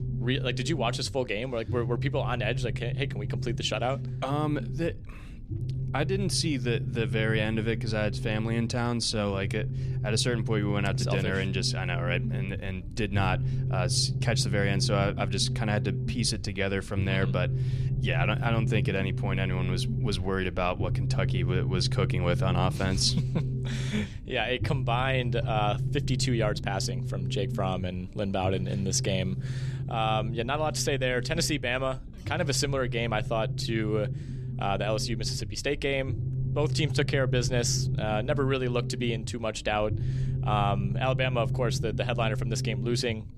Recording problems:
low rumble; noticeable; throughout; 15 dB below the speech

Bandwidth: 14 kHz